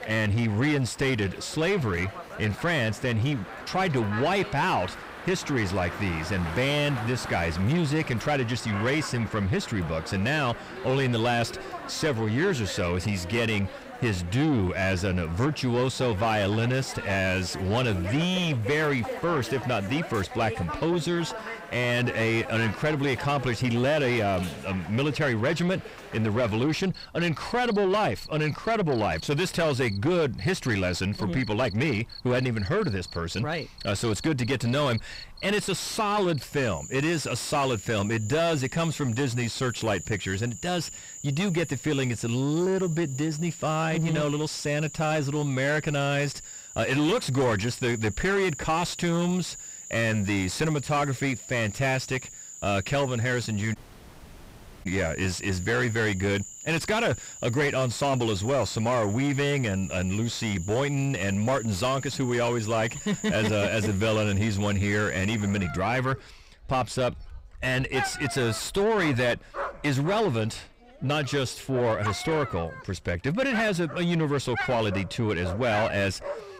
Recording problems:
distortion; heavy; 7 dB below the speech
animal sounds; noticeable; throughout; 10 dB below the speech
audio cutting out; at 54 s for 1 s

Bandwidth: 15.5 kHz